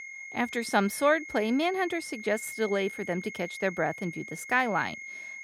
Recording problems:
high-pitched whine; noticeable; throughout; 2 kHz, 10 dB below the speech

